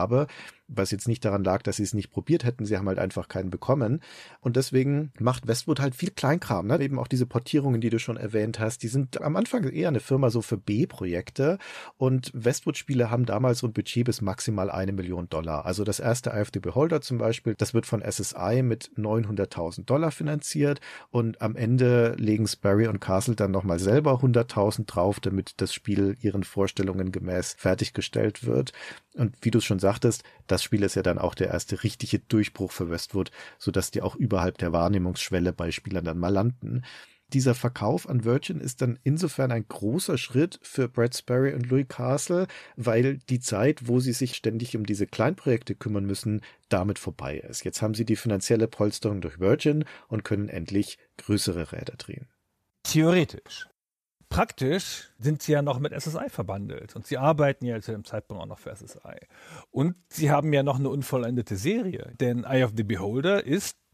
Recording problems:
abrupt cut into speech; at the start

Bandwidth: 14.5 kHz